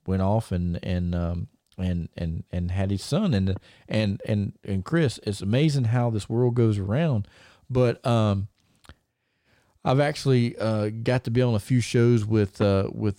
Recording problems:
none

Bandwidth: 16 kHz